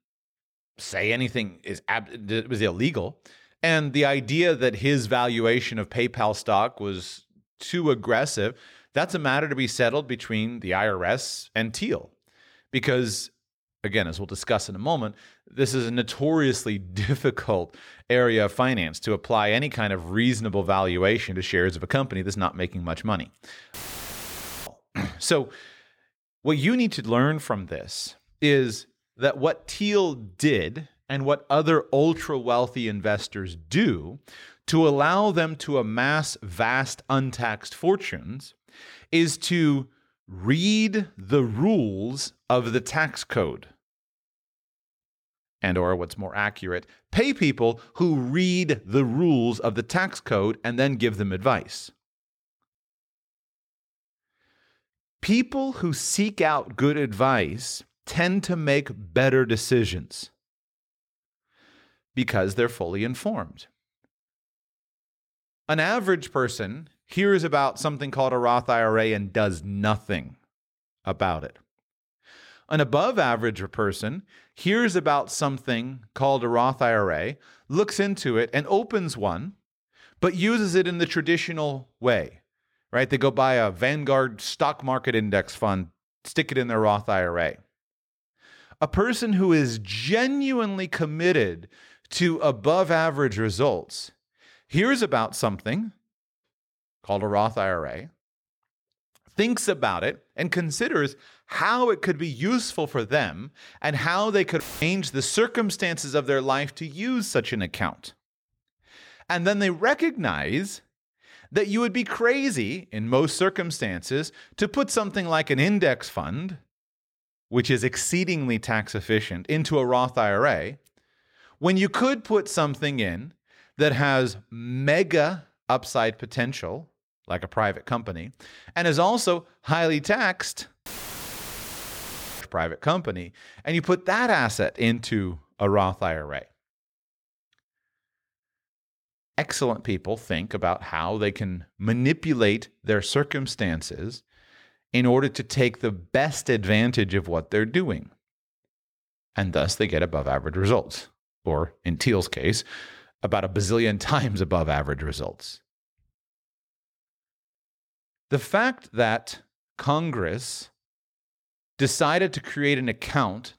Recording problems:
audio cutting out; filled with static; at 24 s for 1 s, at 1:45 and at 2:11 for 1.5 s

